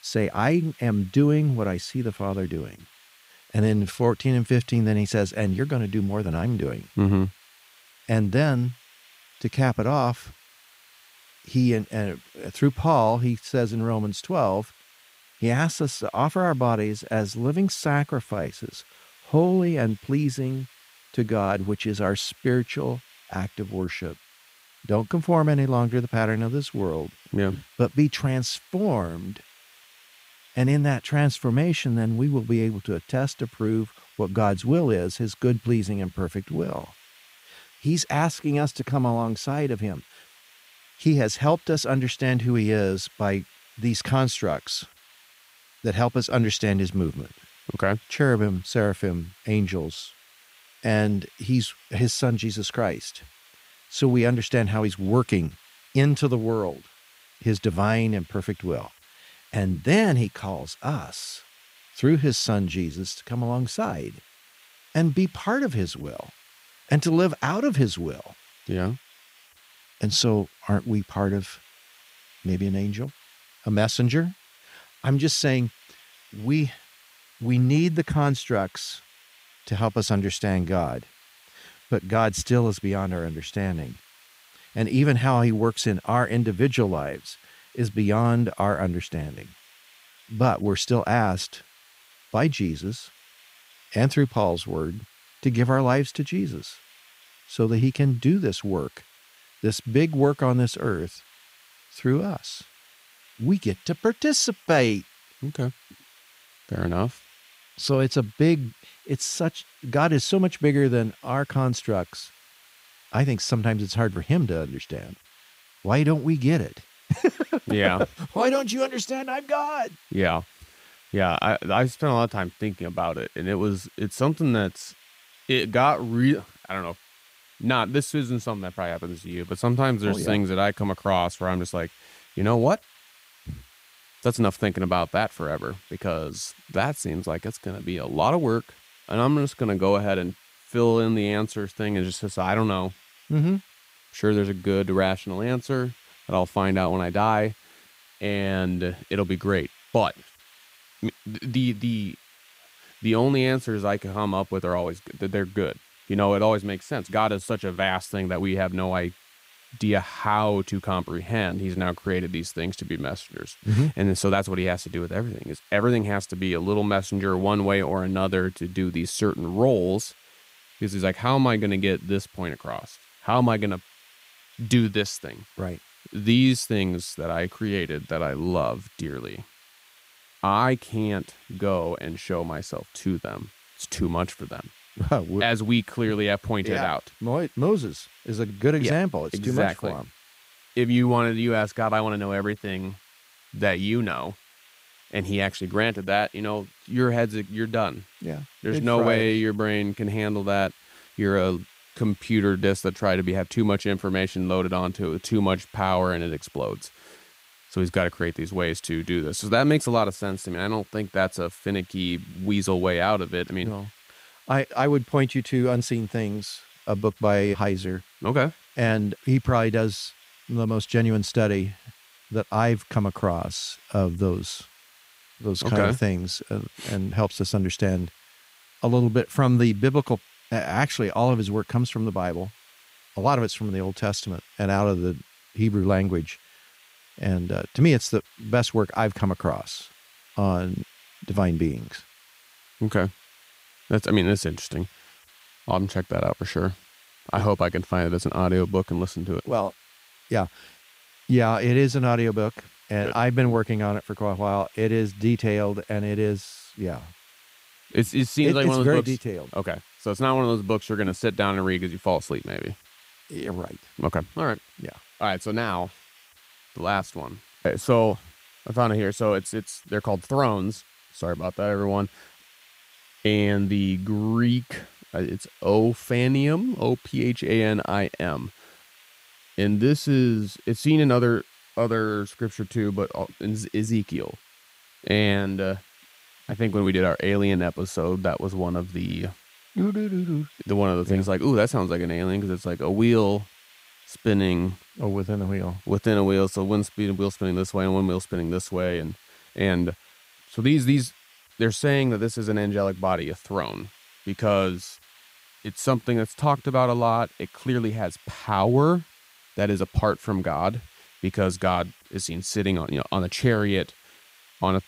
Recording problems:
hiss; faint; throughout; 25 dB below the speech

